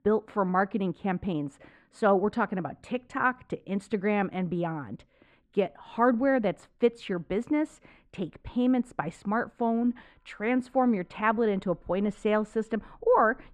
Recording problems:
muffled; very; fading above 3.5 kHz

